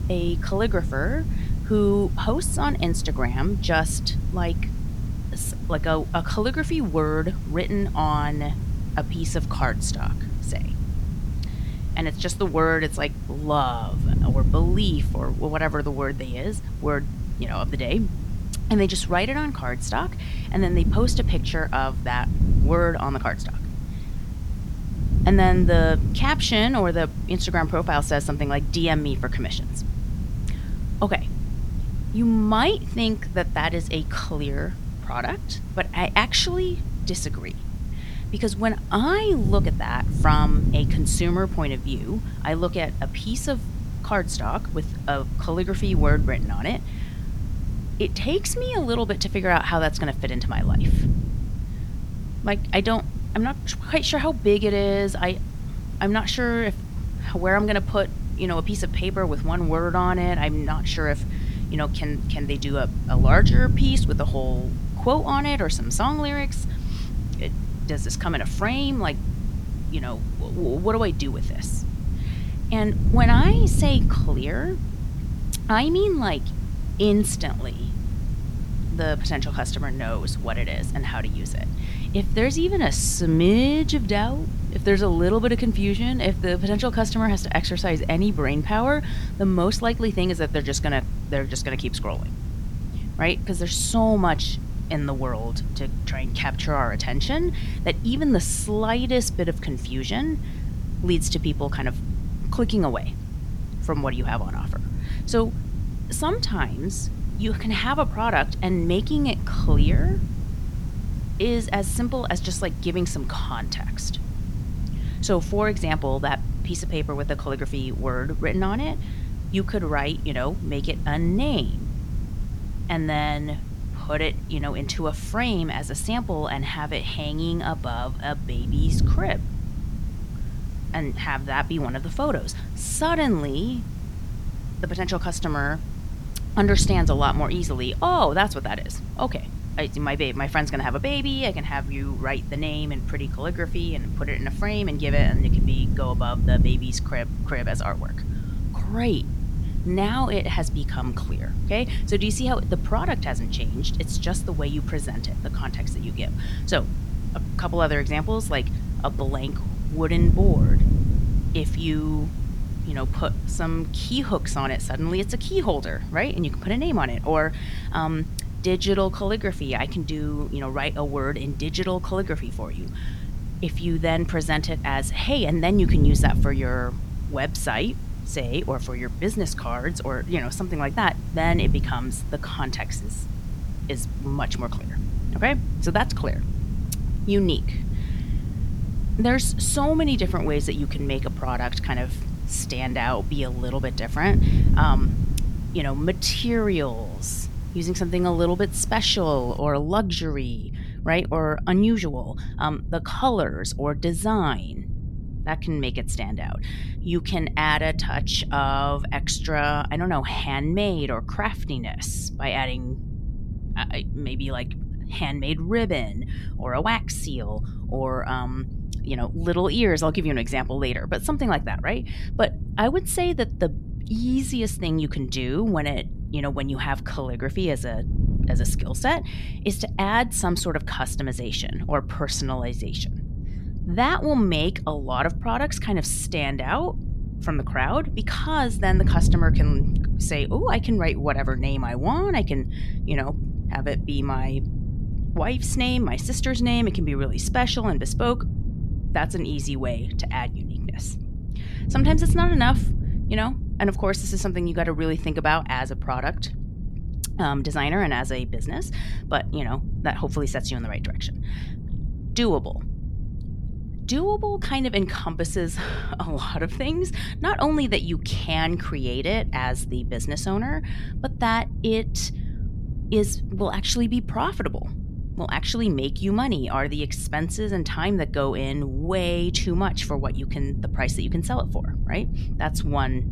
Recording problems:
wind noise on the microphone; occasional gusts; 15 dB below the speech
hiss; faint; until 3:20; 25 dB below the speech

